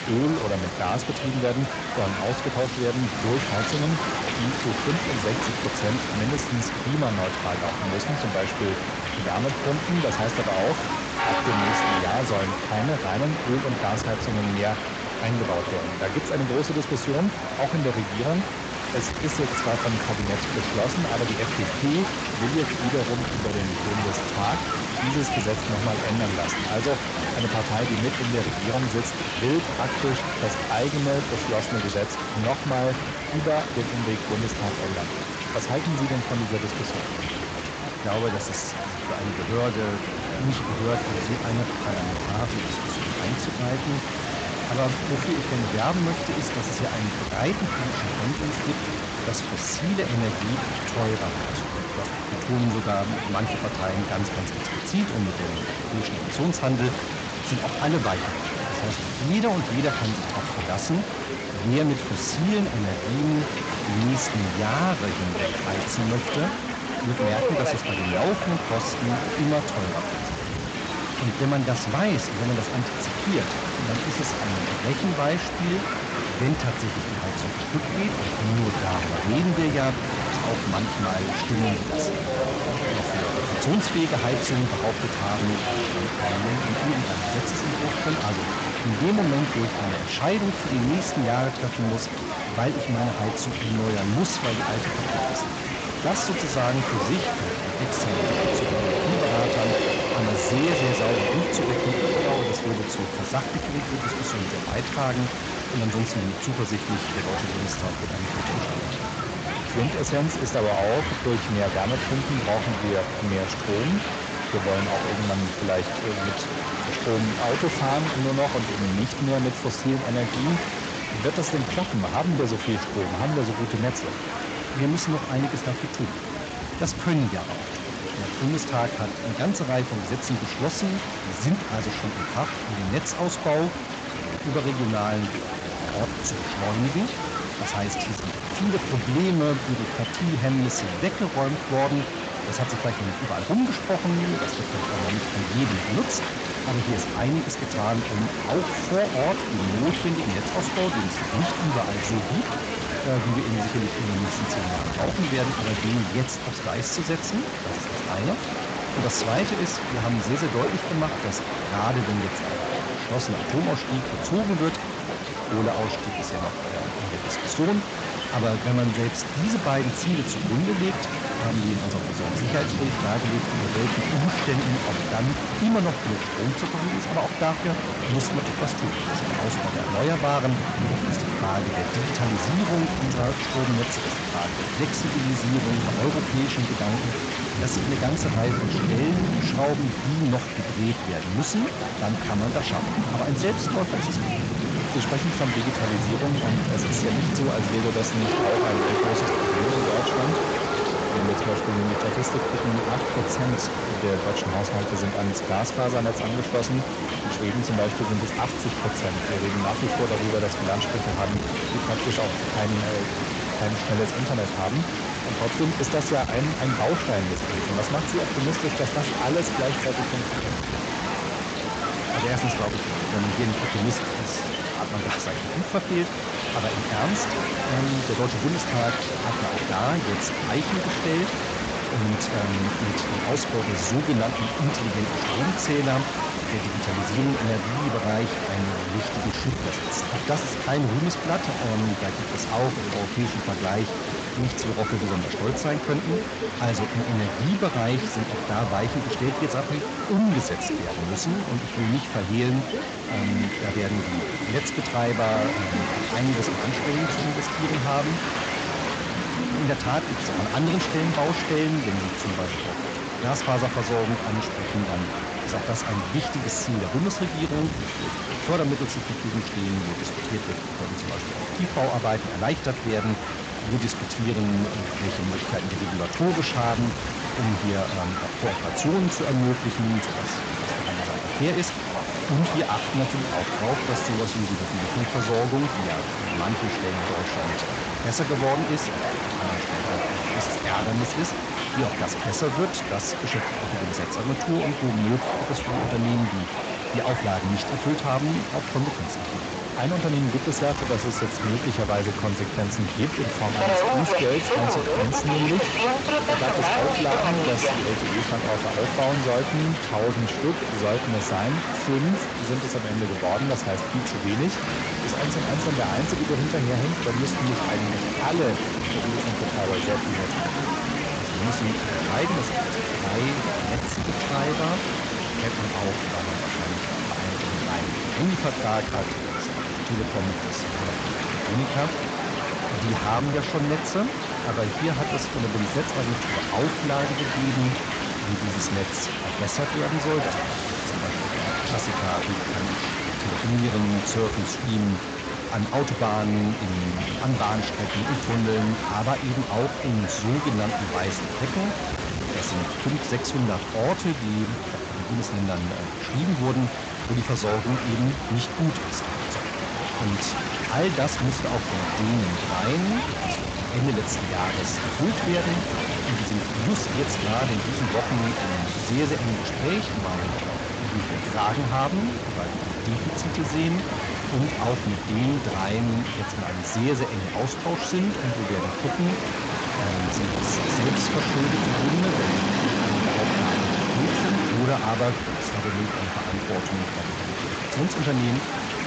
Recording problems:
distortion; slight; 10% of the sound clipped
garbled, watery; slightly; nothing above 7.5 kHz
train or aircraft noise; loud; throughout; 5 dB below the speech
hiss; loud; throughout; 3 dB below the speech
background chatter; noticeable; throughout; 4 voices, 10 dB below the speech

